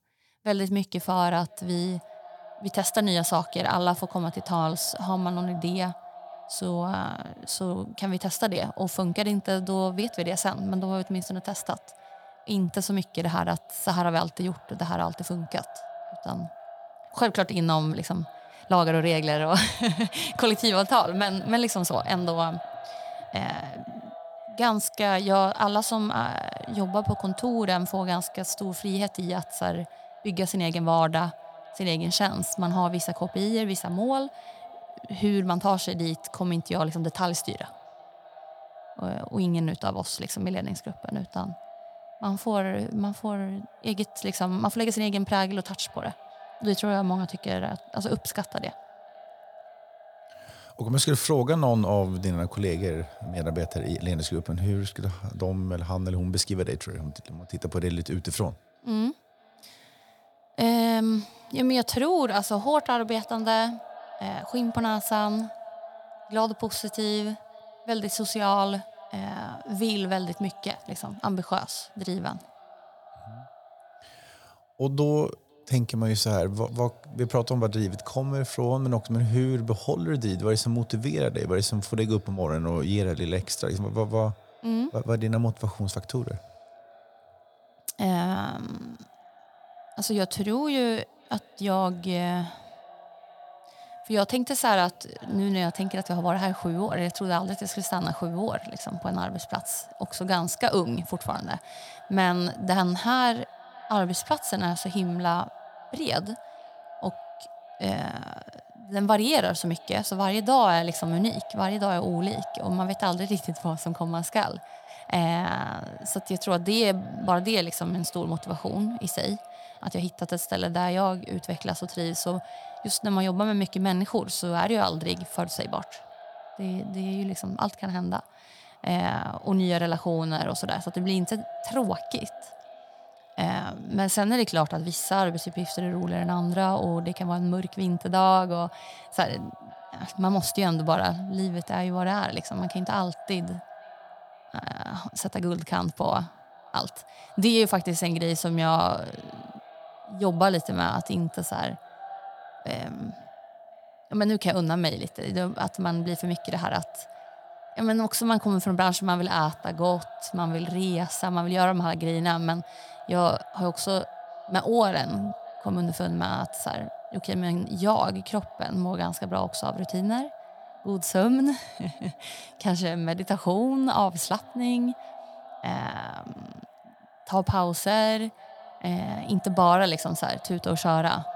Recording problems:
echo of what is said; noticeable; throughout; 510 ms later, 20 dB below the speech

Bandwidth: 18 kHz